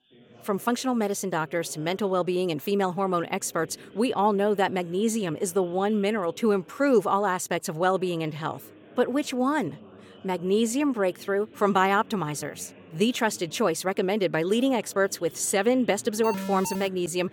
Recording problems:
background chatter; faint; throughout; 4 voices, 25 dB below the speech
alarm; noticeable; at 16 s; peak 7 dB below the speech

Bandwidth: 18 kHz